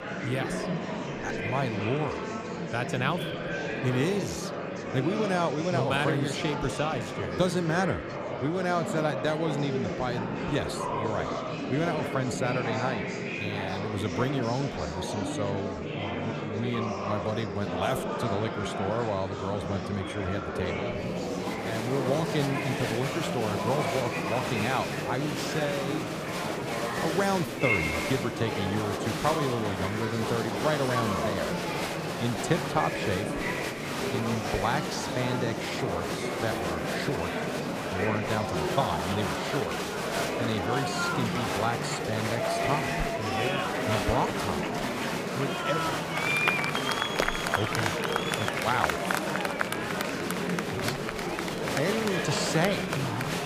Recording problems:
murmuring crowd; very loud; throughout; 1 dB above the speech

